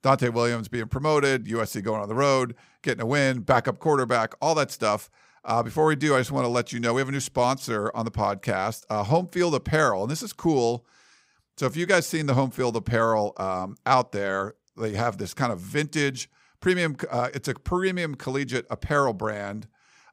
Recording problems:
none

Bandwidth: 15.5 kHz